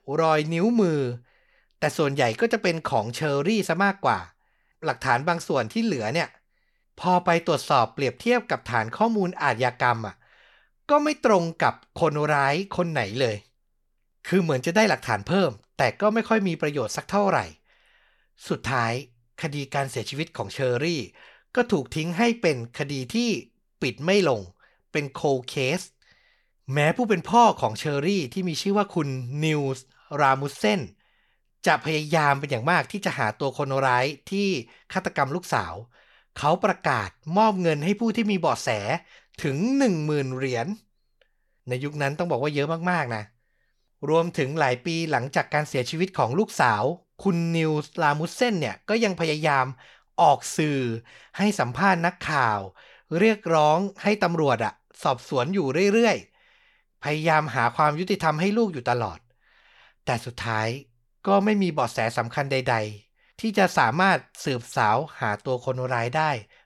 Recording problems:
none

